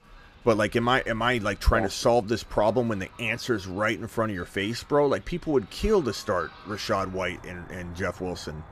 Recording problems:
animal sounds; faint; throughout; 20 dB below the speech

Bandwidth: 14.5 kHz